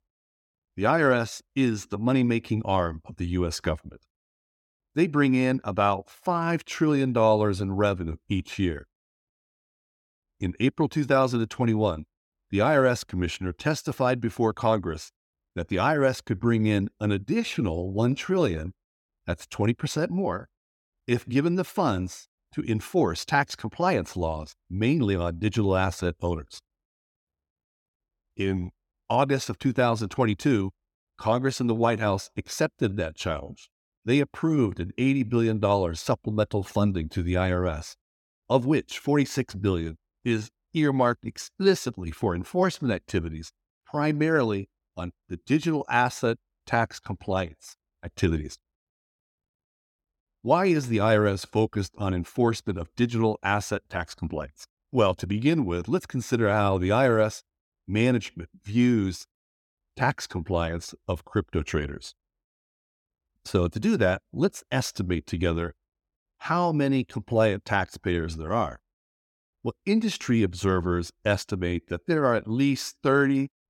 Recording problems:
none

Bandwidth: 17 kHz